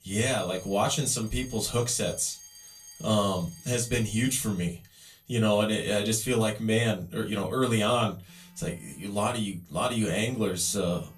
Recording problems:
off-mic speech; far
room echo; very slight; dies away in 0.2 s
alarms or sirens; noticeable; throughout; 20 dB below the speech

